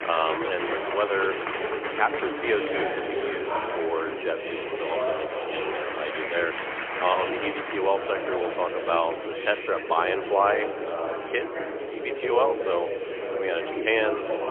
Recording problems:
phone-call audio; poor line; nothing above 3.5 kHz
murmuring crowd; loud; throughout; 2 dB below the speech

